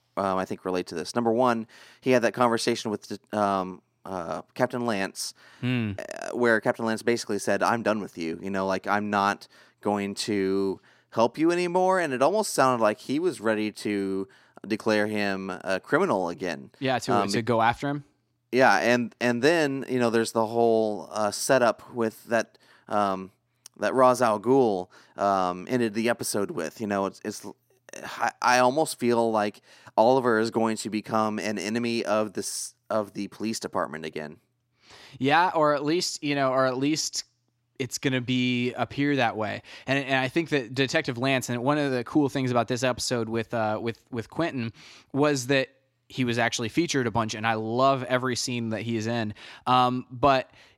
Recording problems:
none

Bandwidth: 16 kHz